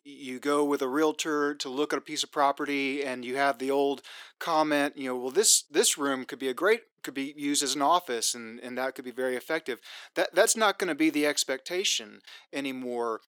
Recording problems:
thin; somewhat; fading below 300 Hz

